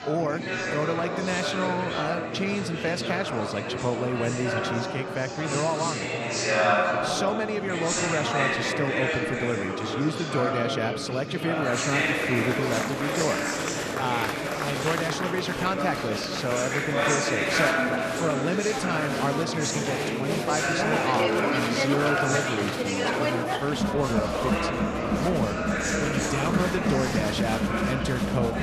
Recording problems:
murmuring crowd; very loud; throughout; 3 dB above the speech

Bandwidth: 13.5 kHz